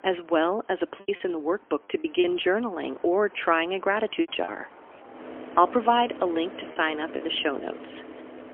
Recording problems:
phone-call audio; poor line; nothing above 3.5 kHz
traffic noise; noticeable; throughout; 15 dB below the speech
choppy; very; from 1 to 2 s and from 4 to 7 s; 9% of the speech affected

